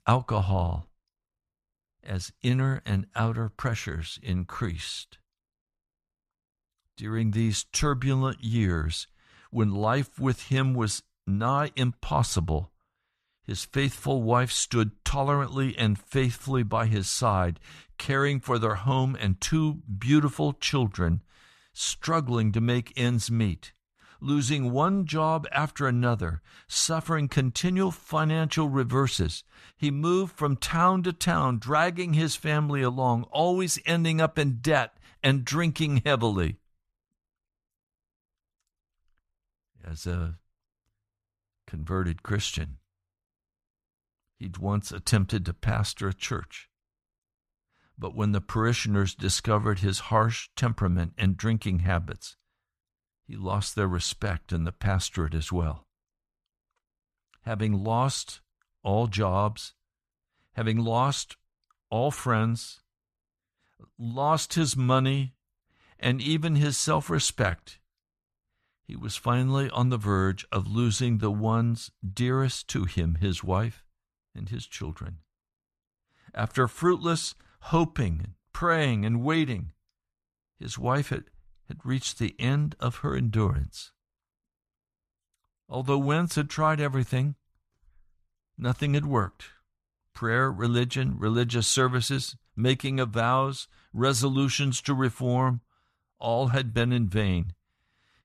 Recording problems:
none

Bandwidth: 13.5 kHz